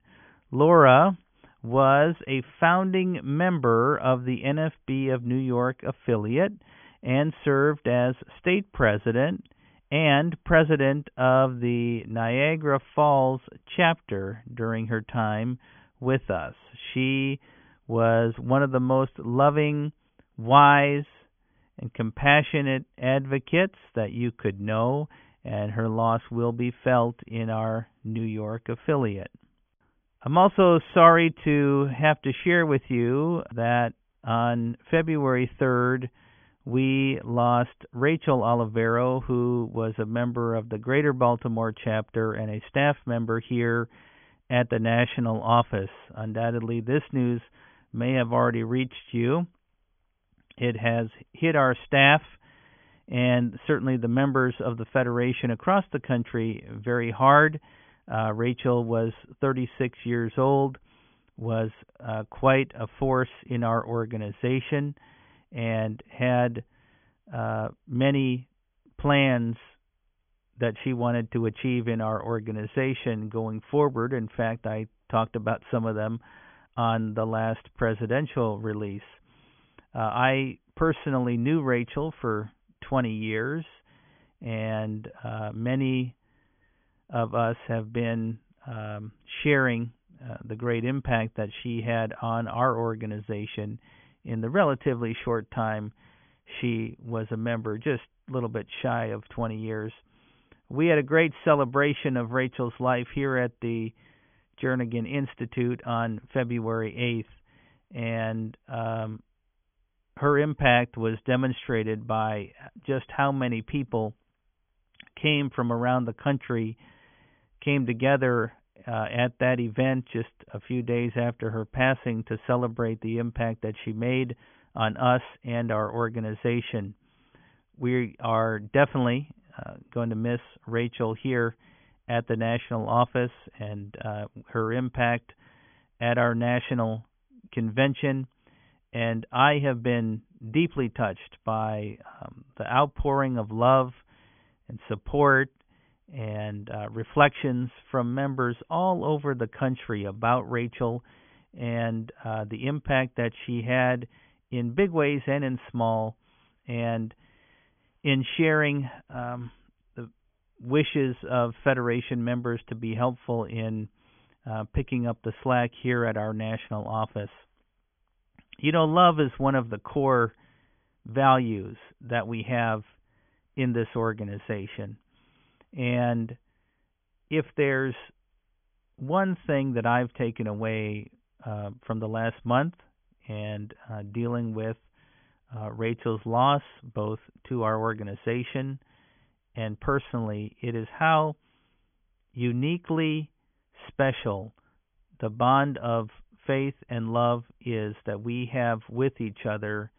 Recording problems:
high frequencies cut off; severe; nothing above 3.5 kHz

